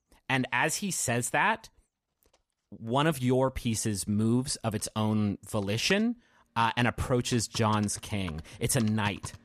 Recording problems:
household noises; noticeable; throughout; 20 dB below the speech

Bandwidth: 15 kHz